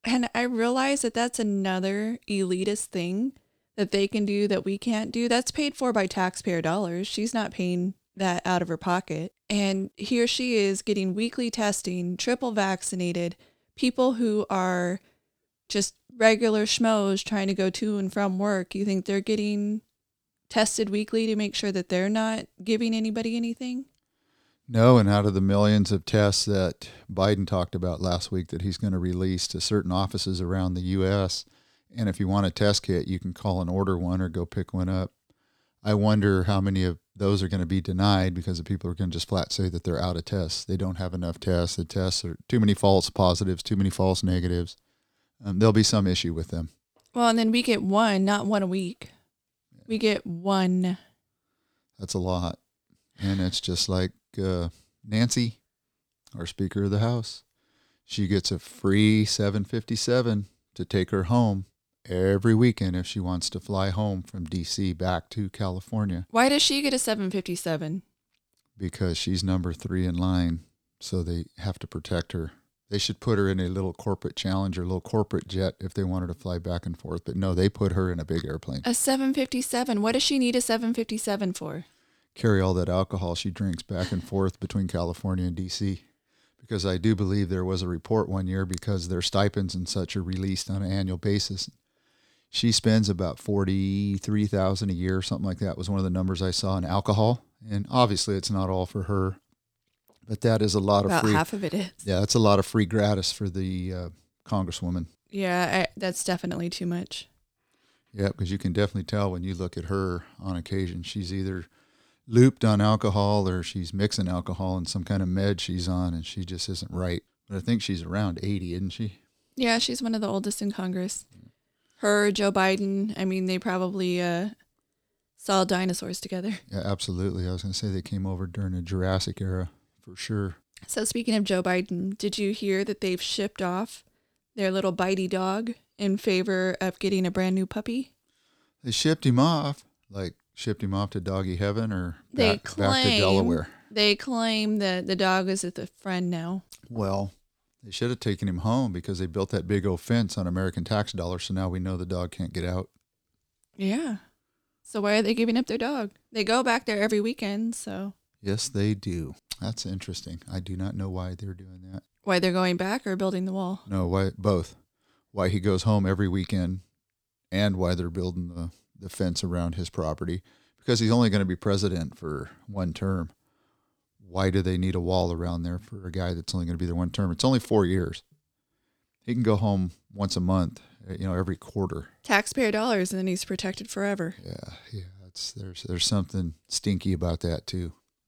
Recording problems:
none

